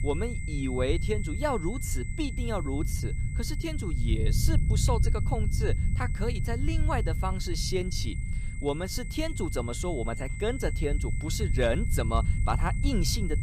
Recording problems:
high-pitched whine; noticeable; throughout; 2 kHz, 10 dB below the speech
low rumble; noticeable; throughout; 15 dB below the speech

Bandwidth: 15 kHz